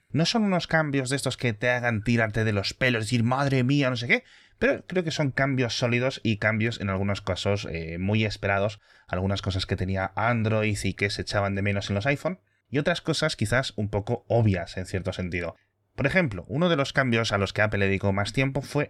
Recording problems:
none

